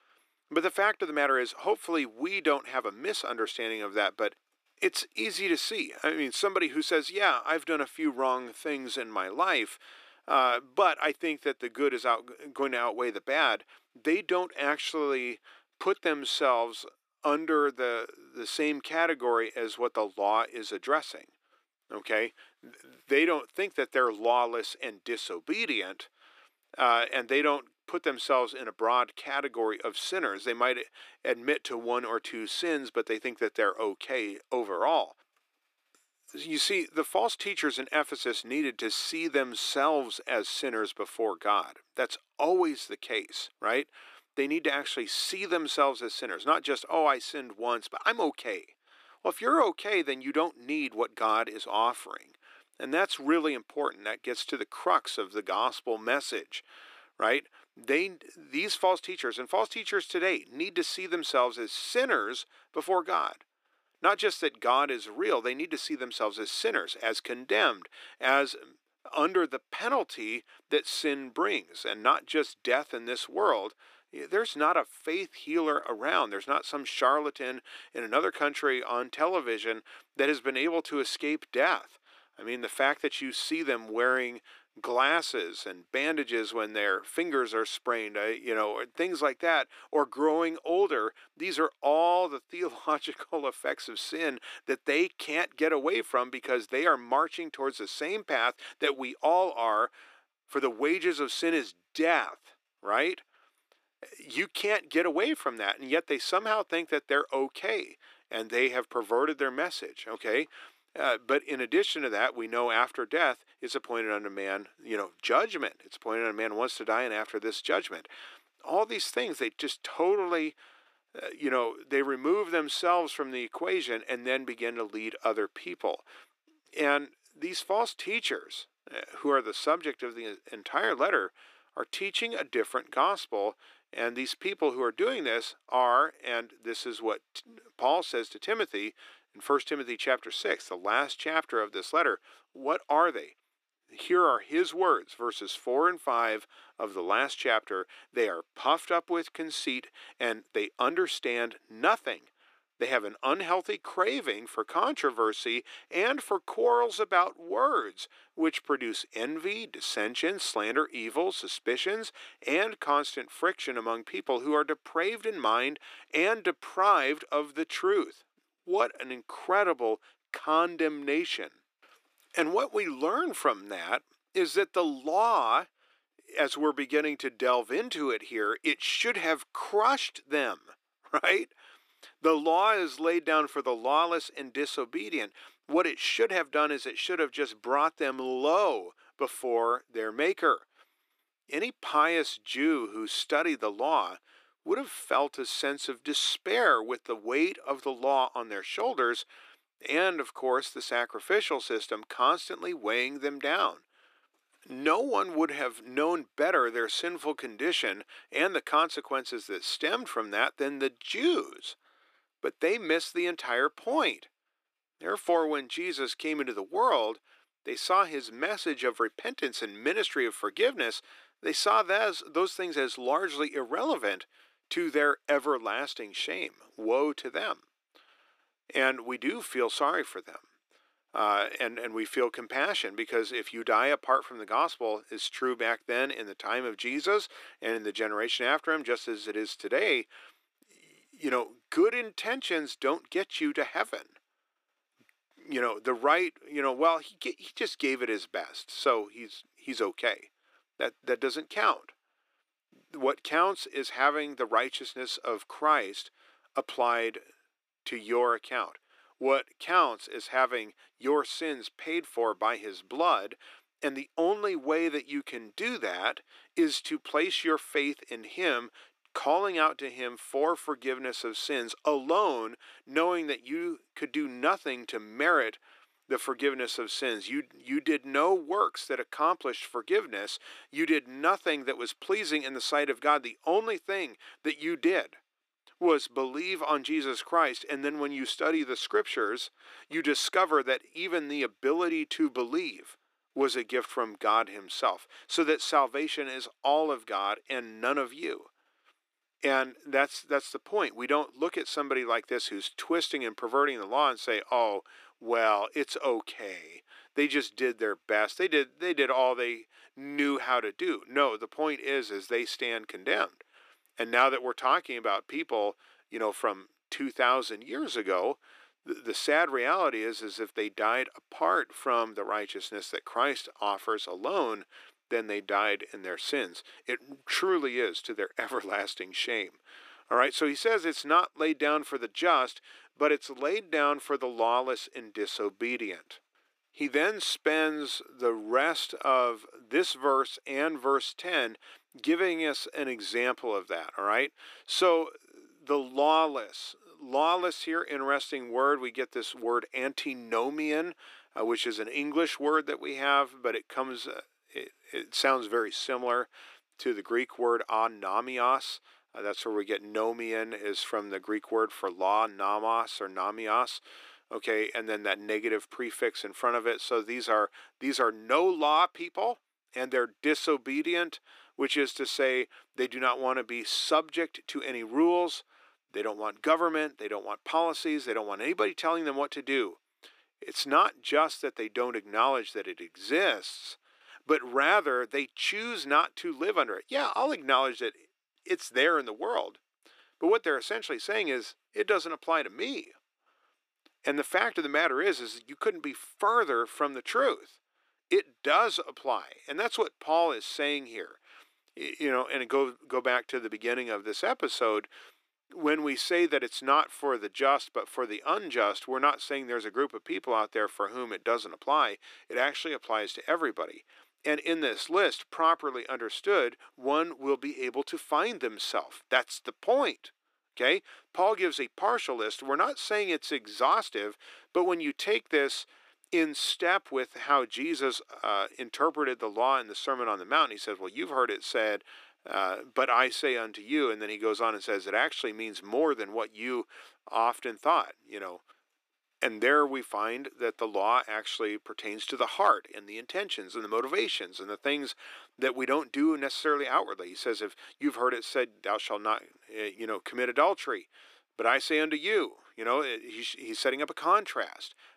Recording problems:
thin; somewhat; fading below 300 Hz

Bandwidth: 14.5 kHz